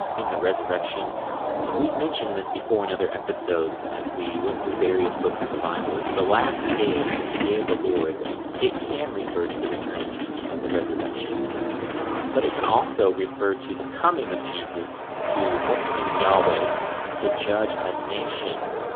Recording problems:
phone-call audio; poor line; nothing above 3.5 kHz
traffic noise; loud; throughout; 2 dB below the speech

